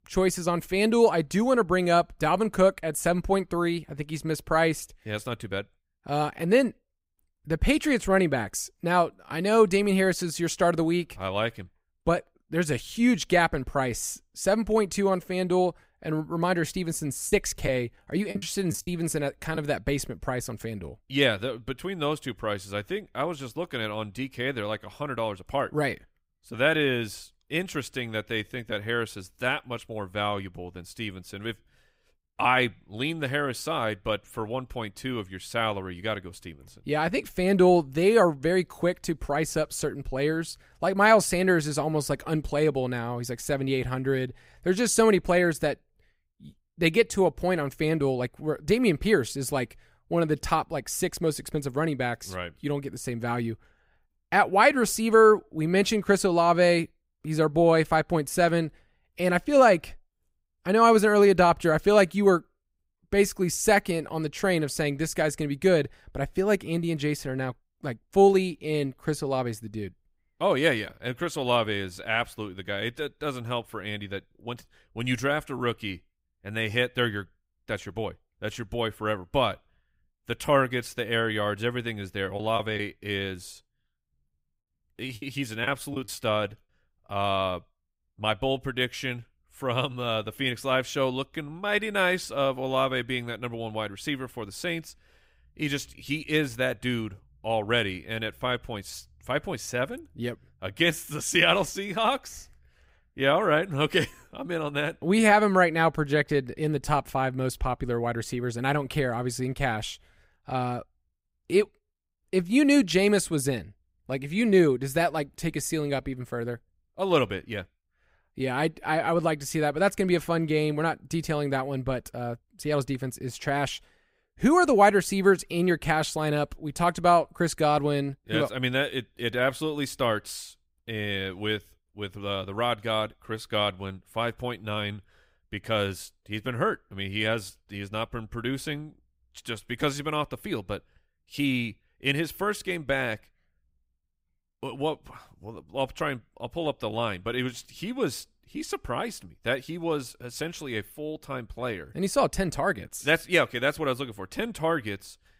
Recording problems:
choppy; very; from 17 to 20 s and from 1:22 to 1:26; 9% of the speech affected

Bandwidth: 15.5 kHz